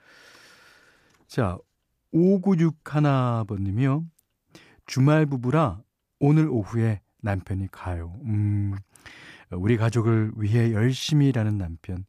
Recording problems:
none

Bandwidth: 14.5 kHz